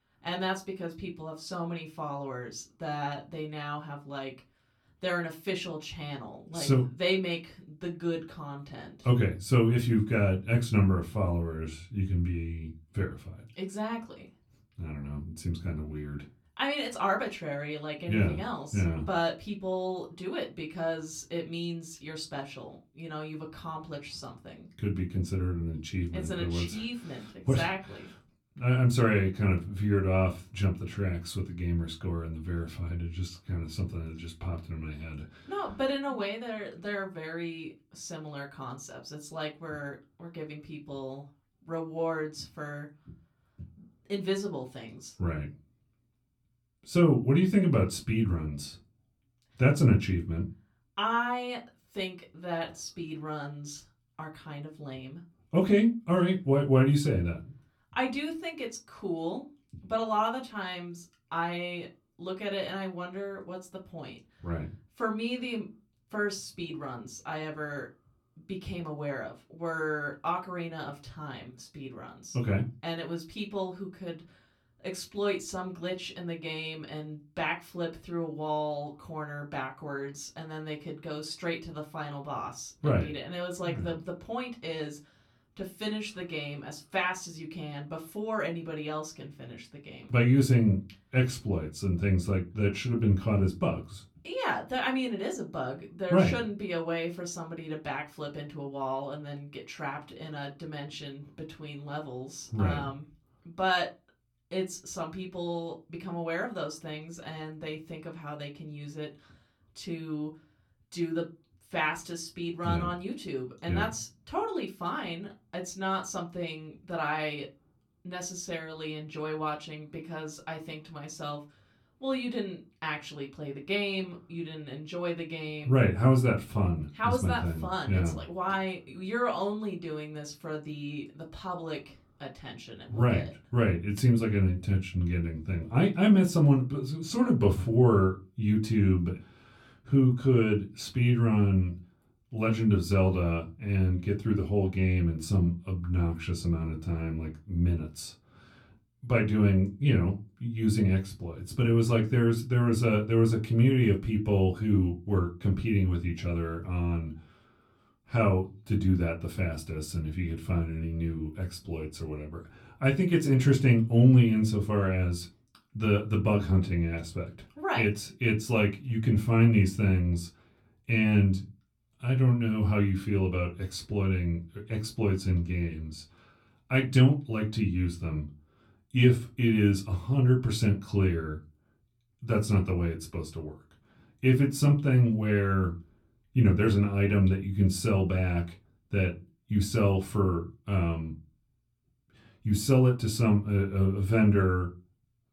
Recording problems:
off-mic speech; far
room echo; very slight; dies away in 0.2 s

